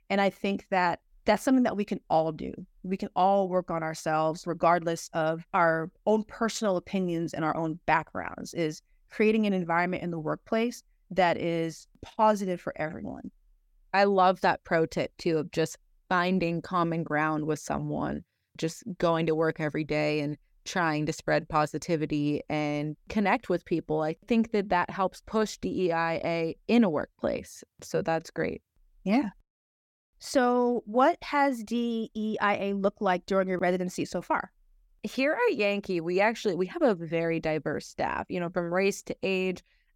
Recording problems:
none

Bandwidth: 17 kHz